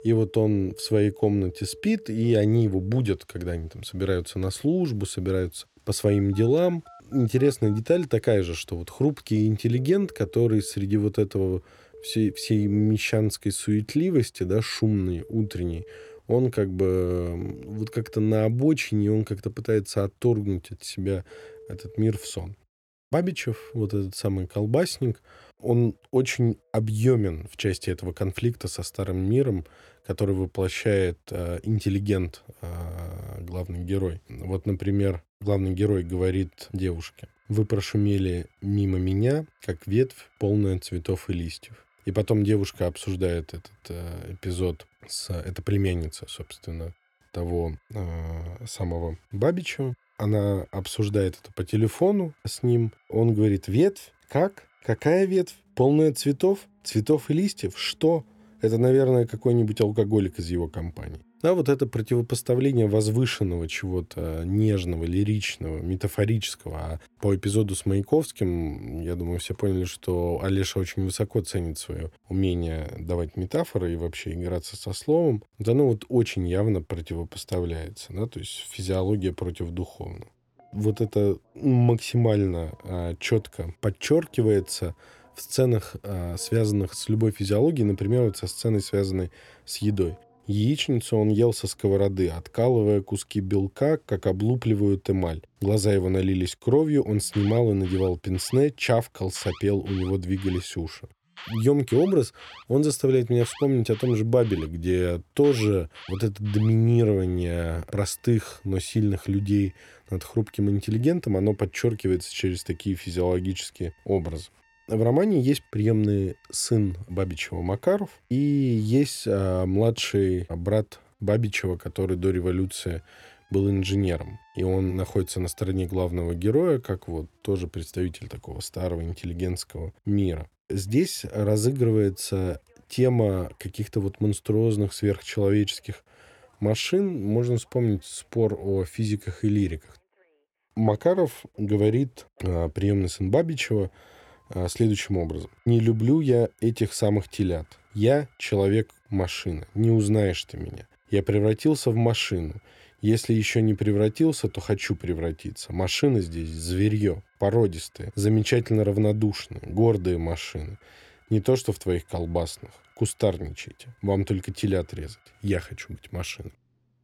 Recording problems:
alarms or sirens; faint; throughout; 25 dB below the speech

